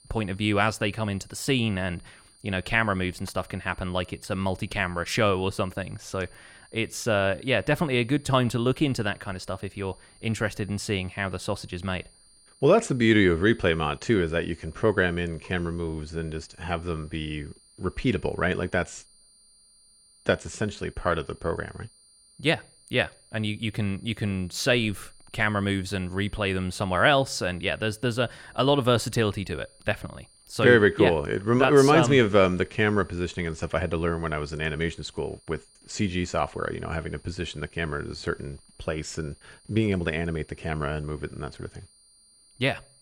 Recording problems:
high-pitched whine; faint; throughout; 9 kHz, 30 dB below the speech

